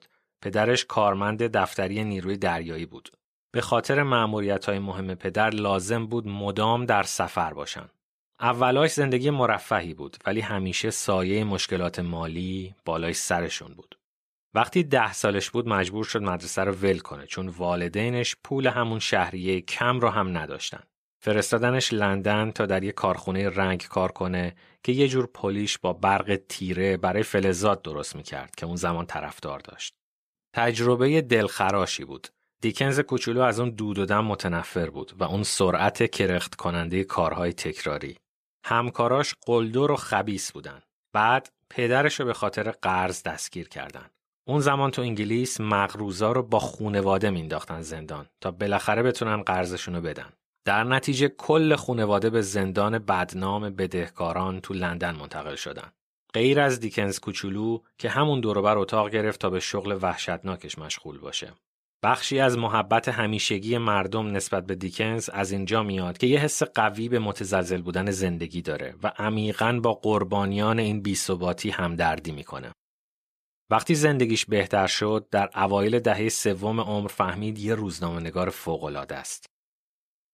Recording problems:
none

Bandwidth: 14.5 kHz